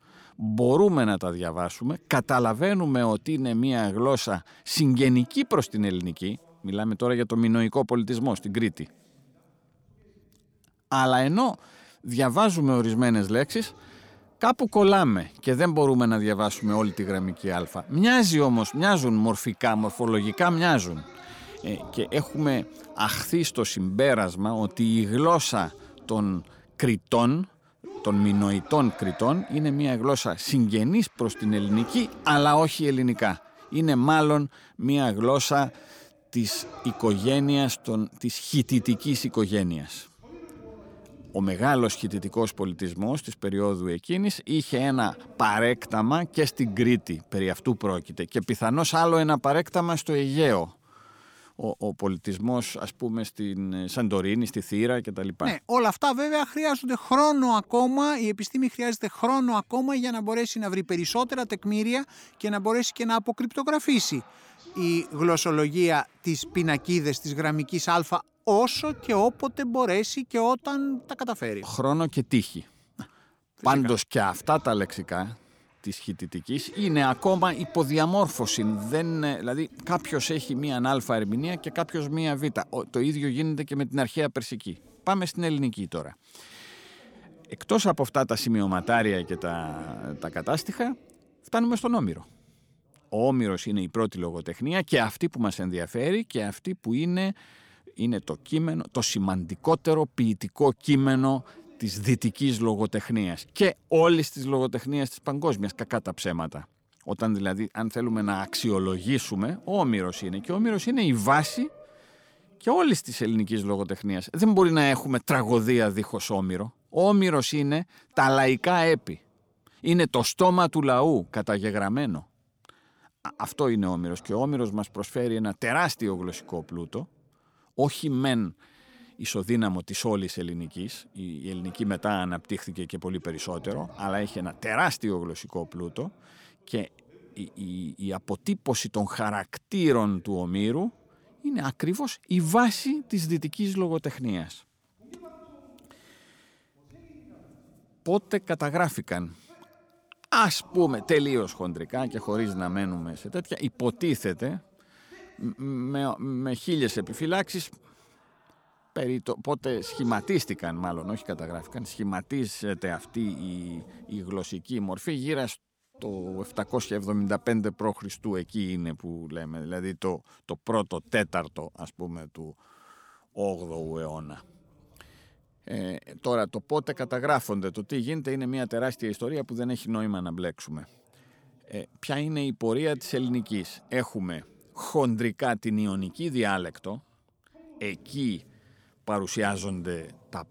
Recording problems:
voice in the background; faint; throughout; 25 dB below the speech

